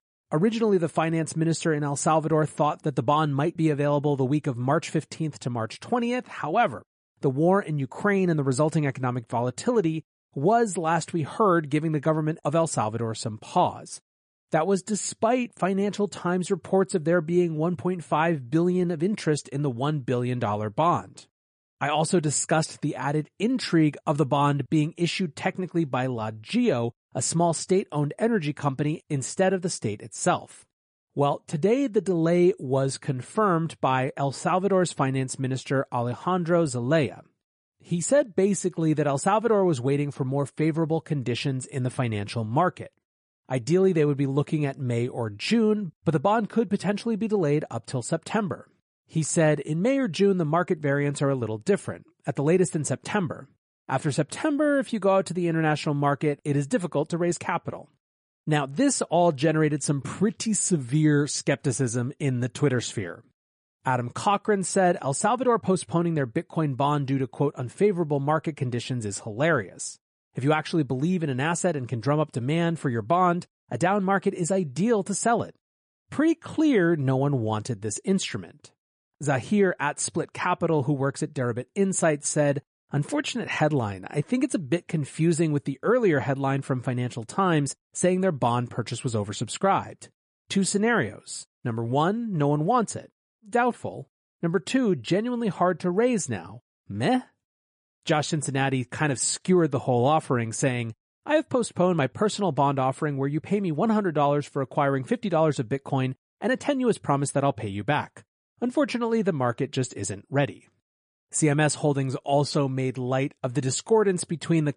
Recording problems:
garbled, watery; slightly; nothing above 10 kHz

